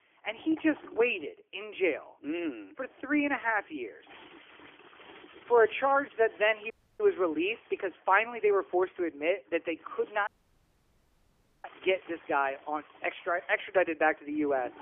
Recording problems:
phone-call audio; nothing above 3 kHz
household noises; faint; throughout; 25 dB below the speech
audio cutting out; at 6.5 s and at 10 s for 1.5 s

